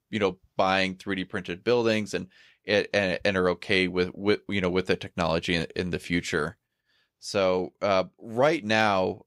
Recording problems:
none

